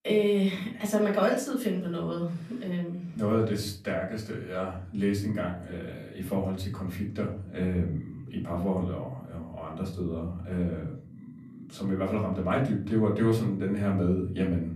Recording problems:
off-mic speech; far
room echo; slight; dies away in 0.4 s

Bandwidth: 14.5 kHz